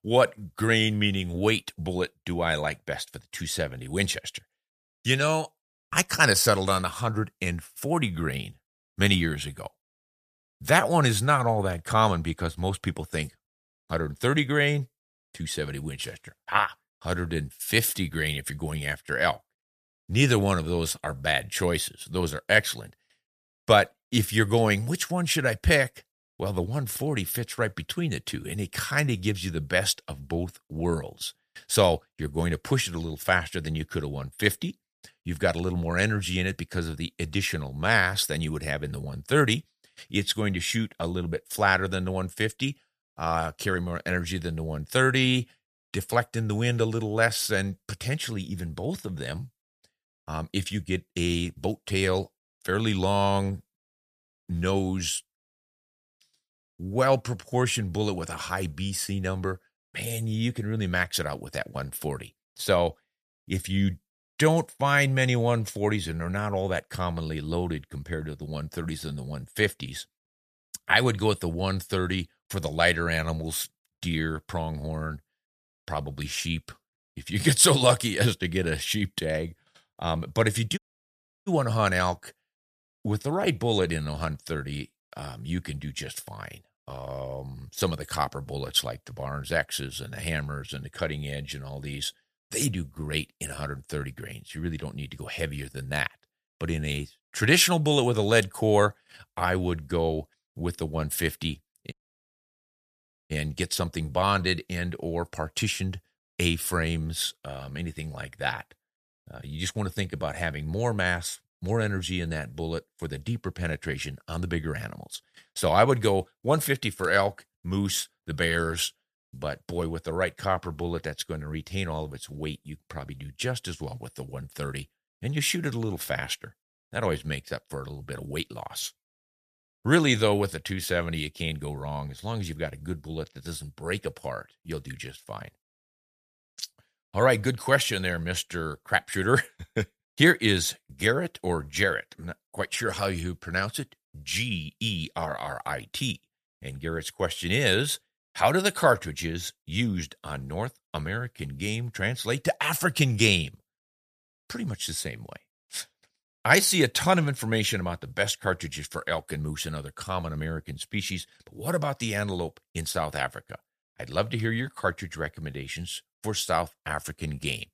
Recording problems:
audio cutting out; at 1:21 for 0.5 s and at 1:42 for 1.5 s

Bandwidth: 14.5 kHz